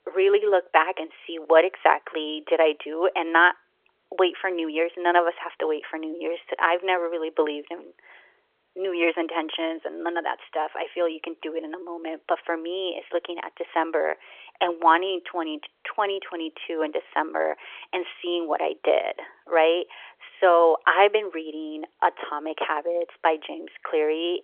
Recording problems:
phone-call audio; nothing above 3.5 kHz

